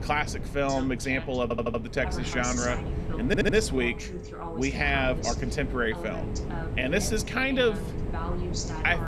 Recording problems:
voice in the background; noticeable; throughout; 10 dB below the speech
wind noise on the microphone; occasional gusts; 15 dB below the speech
audio stuttering; at 1.5 s and at 3.5 s
phone ringing; noticeable; from 2 s on; peak 9 dB below the speech

